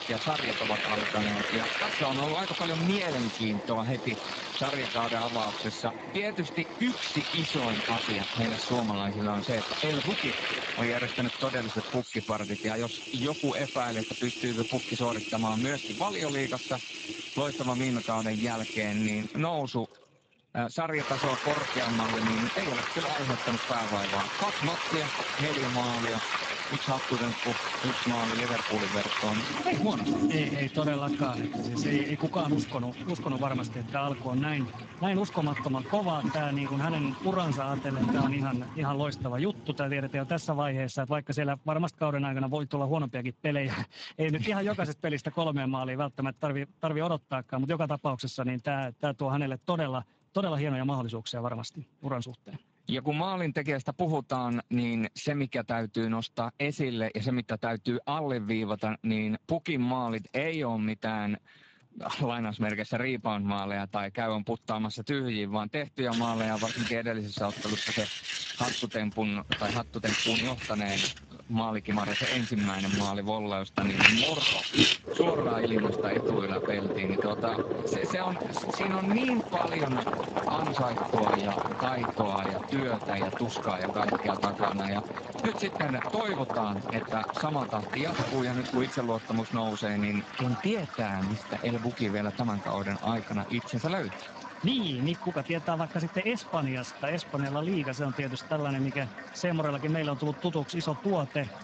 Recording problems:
garbled, watery; slightly; nothing above 7.5 kHz
household noises; loud; throughout; 1 dB below the speech

